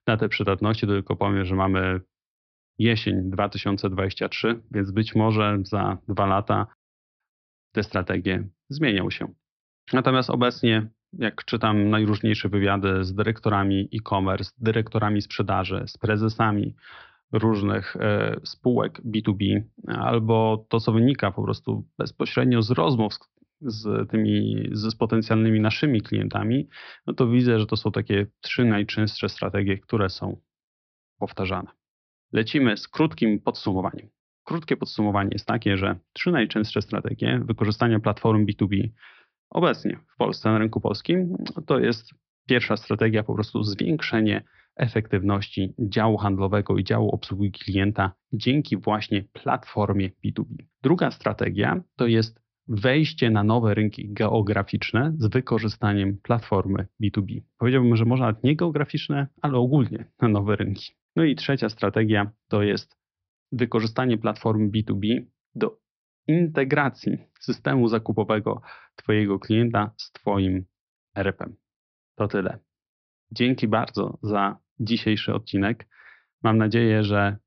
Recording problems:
high frequencies cut off; noticeable; nothing above 5.5 kHz

